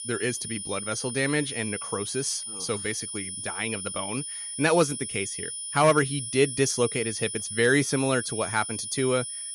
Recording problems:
high-pitched whine; loud; throughout; 9.5 kHz, 6 dB below the speech

